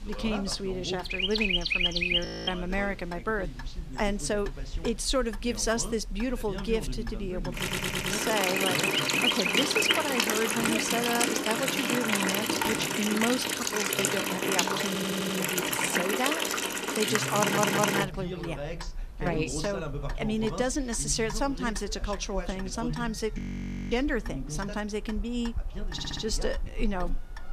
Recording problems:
animal sounds; very loud; throughout; 4 dB above the speech
household noises; very loud; throughout; 3 dB above the speech
voice in the background; loud; throughout; 9 dB below the speech
audio freezing; at 2.5 s and at 23 s for 0.5 s
audio stuttering; 4 times, first at 7.5 s

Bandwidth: 14.5 kHz